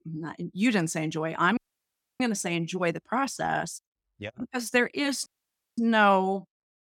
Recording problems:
audio cutting out; at 1.5 s for 0.5 s and at 5.5 s for 0.5 s

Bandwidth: 17 kHz